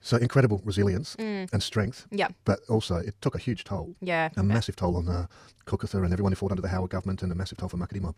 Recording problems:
wrong speed, natural pitch; too fast; 1.8 times normal speed

